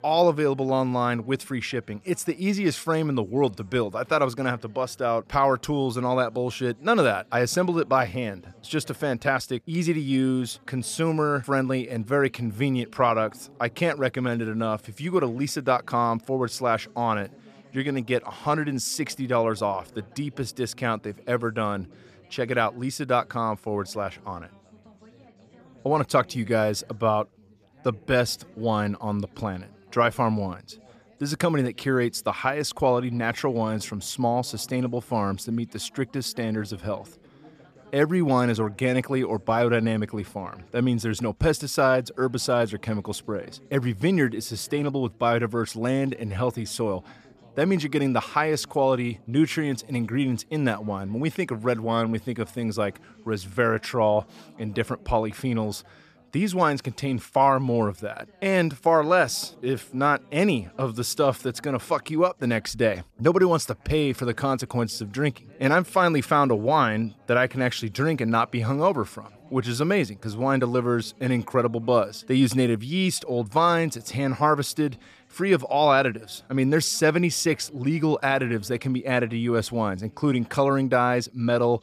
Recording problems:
background chatter; faint; throughout; 3 voices, 30 dB below the speech

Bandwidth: 14.5 kHz